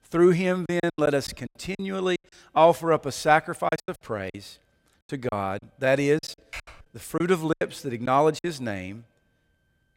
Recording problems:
choppy; very; 11% of the speech affected
keyboard typing; faint; at 6.5 s; peak 15 dB below the speech

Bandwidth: 16 kHz